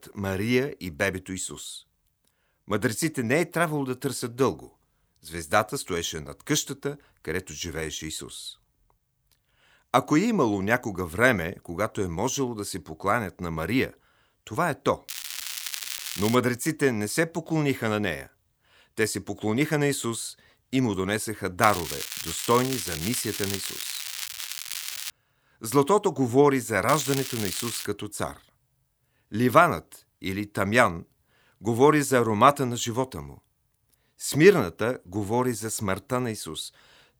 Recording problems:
crackling; loud; from 15 to 16 s, from 22 to 25 s and at 27 s; 6 dB below the speech

